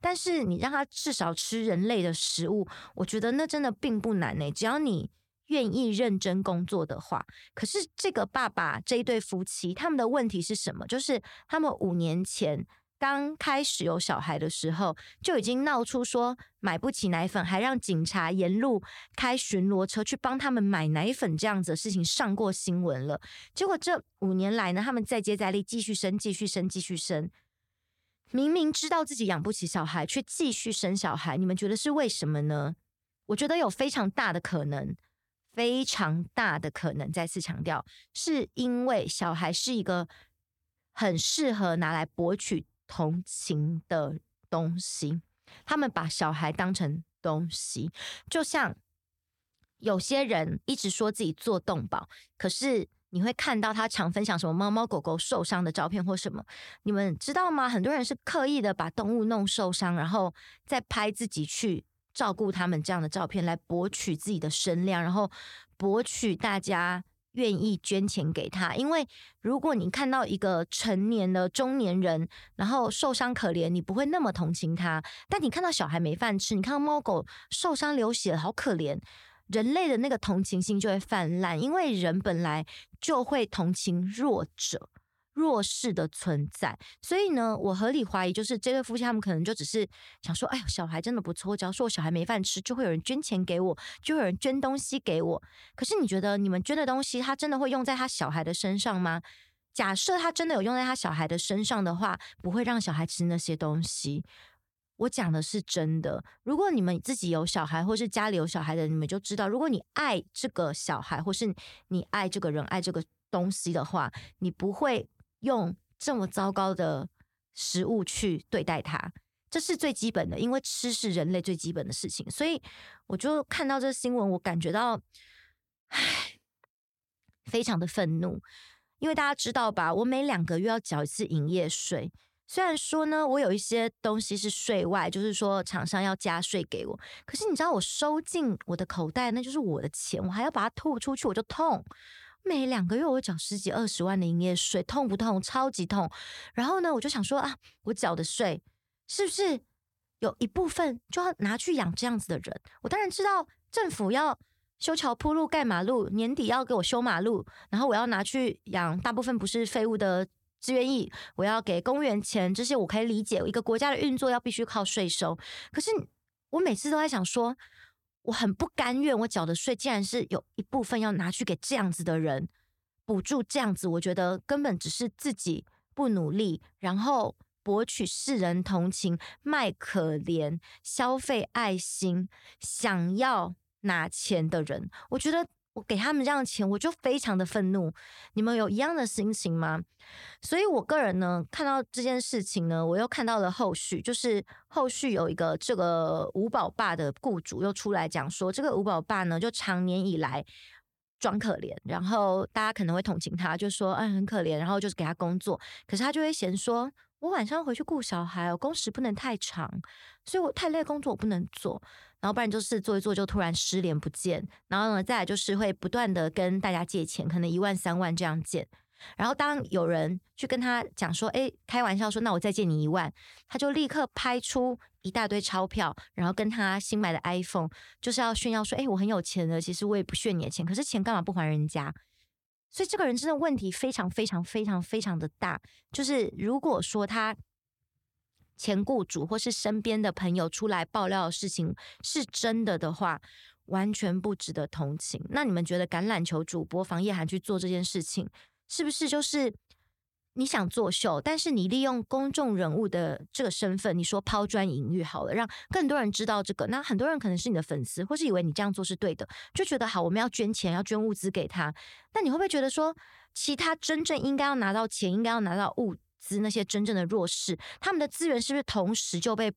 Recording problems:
none

